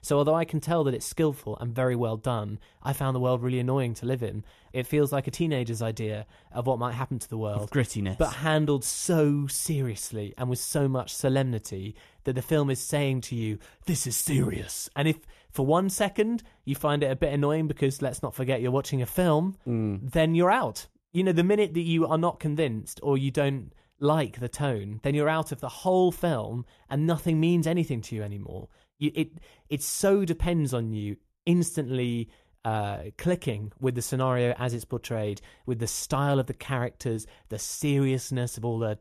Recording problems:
none

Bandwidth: 14 kHz